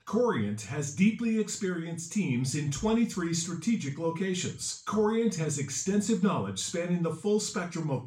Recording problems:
off-mic speech; far
room echo; slight; dies away in 0.3 s

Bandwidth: 16 kHz